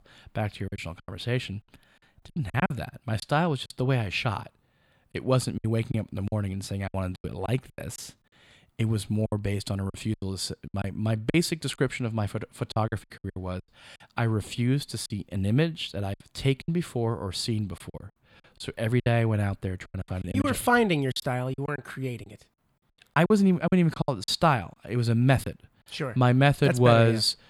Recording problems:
choppy; very; 10% of the speech affected

